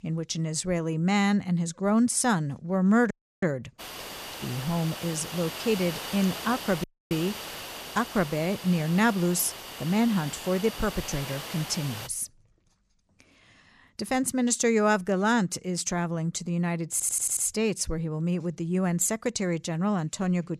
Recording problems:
hiss; noticeable; from 4 to 12 s; 10 dB below the speech
audio cutting out; at 3 s and at 7 s
audio stuttering; at 17 s

